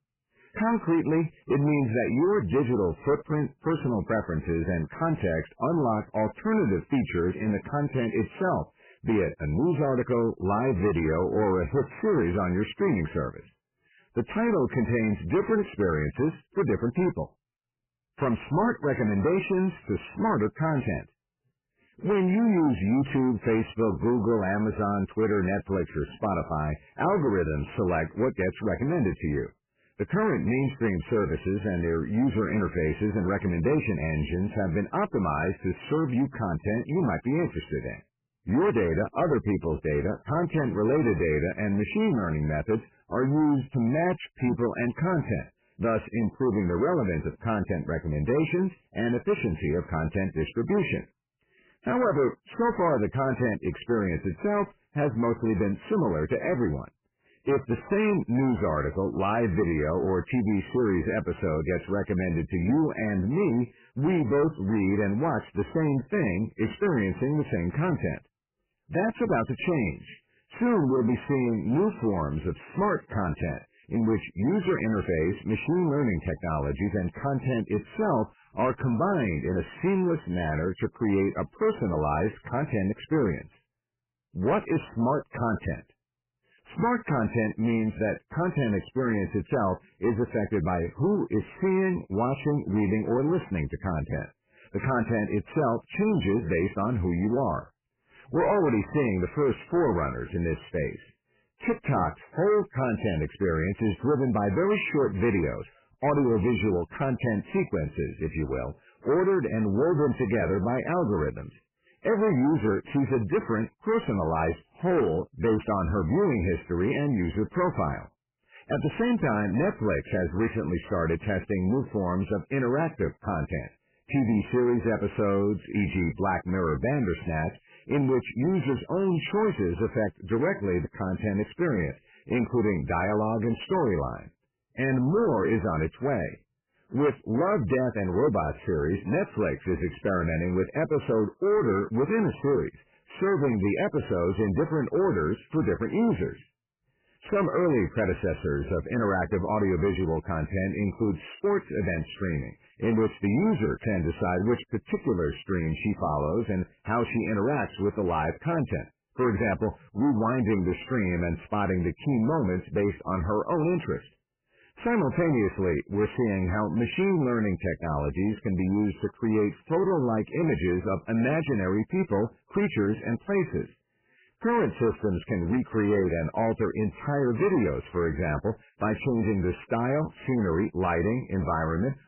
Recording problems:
garbled, watery; badly; nothing above 3 kHz
distortion; slight; 10 dB below the speech

